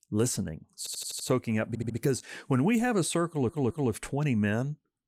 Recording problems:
audio stuttering; at 1 s, at 1.5 s and at 3.5 s

